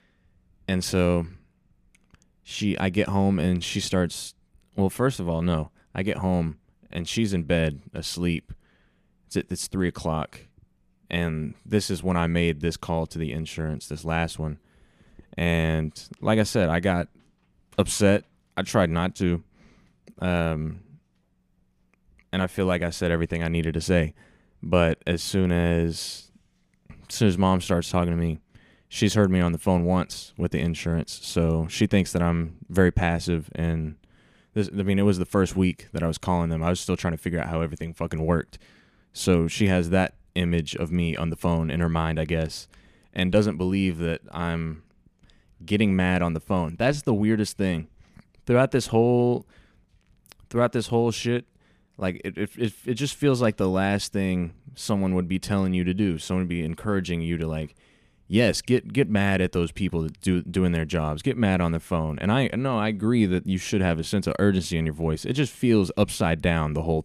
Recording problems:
none

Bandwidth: 14.5 kHz